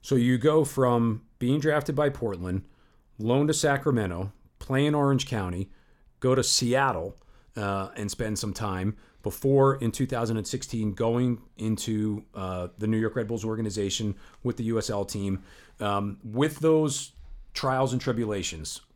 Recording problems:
none

